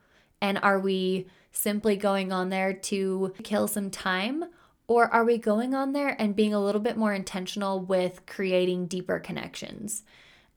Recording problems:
none

